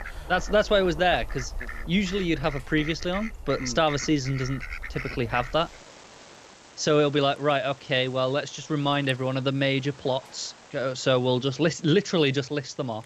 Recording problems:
animal sounds; noticeable; throughout; 15 dB below the speech

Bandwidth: 13.5 kHz